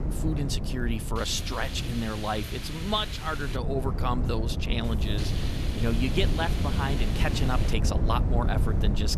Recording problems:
wind noise on the microphone; heavy; 8 dB below the speech
hiss; loud; from 1 to 3.5 s and from 5 to 7.5 s; 9 dB below the speech

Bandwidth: 13.5 kHz